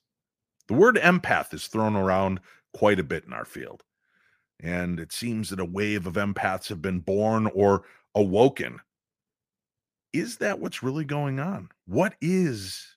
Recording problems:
none

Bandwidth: 15 kHz